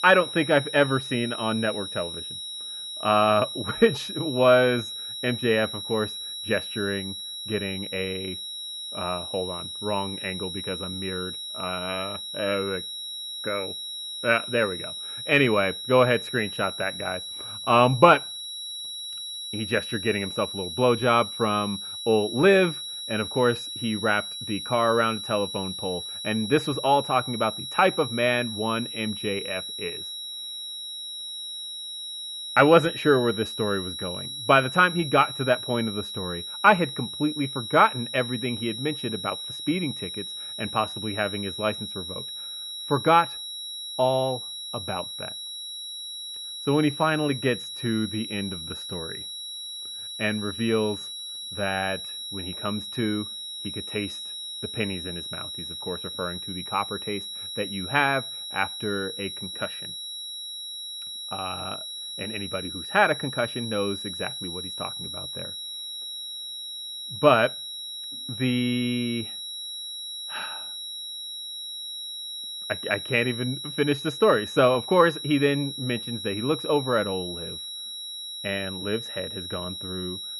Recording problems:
muffled; slightly; fading above 3 kHz
high-pitched whine; loud; throughout; 4 kHz, 7 dB below the speech

